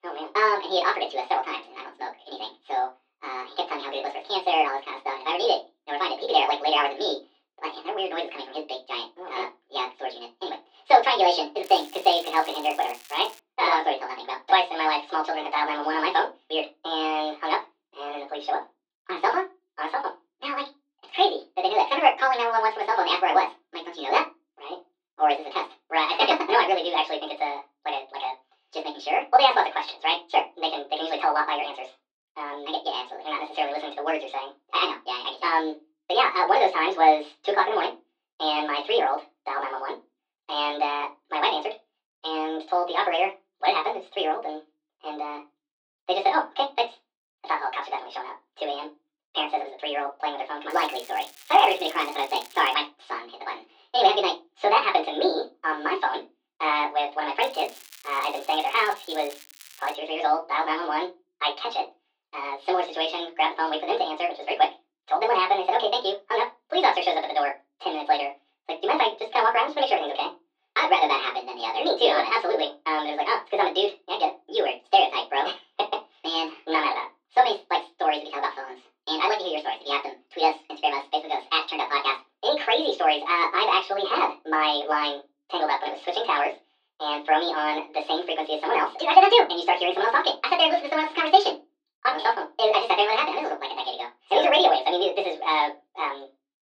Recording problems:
off-mic speech; far
thin; very; fading below 400 Hz
wrong speed and pitch; too fast and too high; 1.6 times normal speed
room echo; very slight; dies away in 0.2 s
muffled; very slightly; fading above 4 kHz
crackling; faint; from 12 to 13 s, from 51 to 53 s and from 57 s to 1:00; 20 dB below the speech

